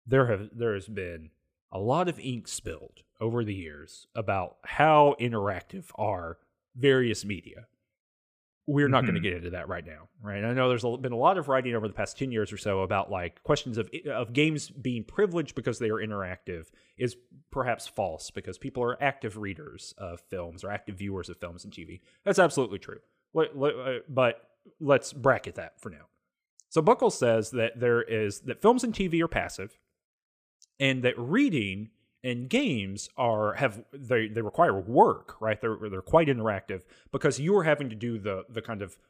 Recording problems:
none

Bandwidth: 15 kHz